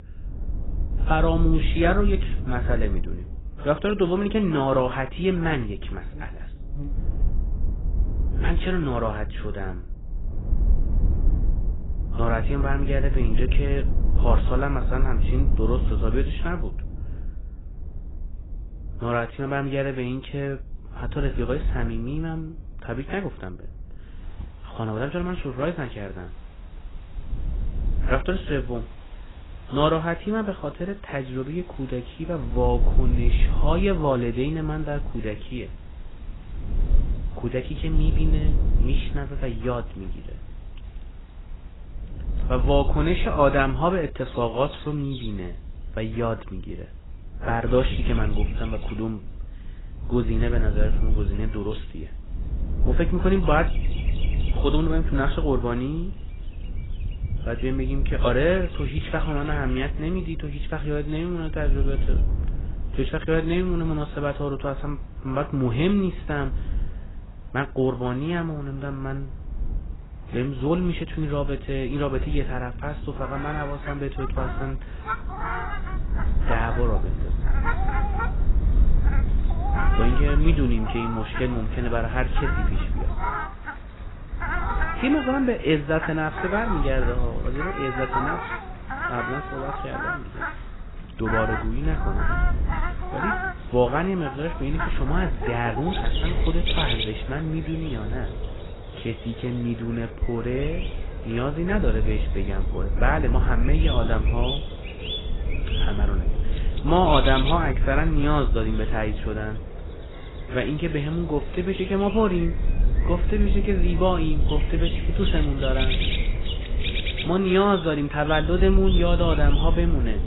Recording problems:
garbled, watery; badly; nothing above 4 kHz
animal sounds; loud; throughout; 8 dB below the speech
wind noise on the microphone; occasional gusts; 15 dB below the speech

